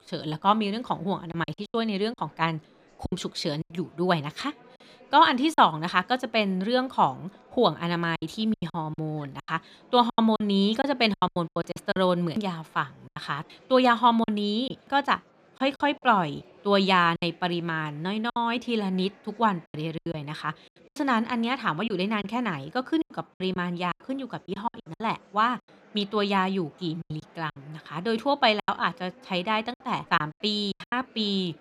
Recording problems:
murmuring crowd; faint; throughout; 30 dB below the speech
choppy; very; 10% of the speech affected

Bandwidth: 14.5 kHz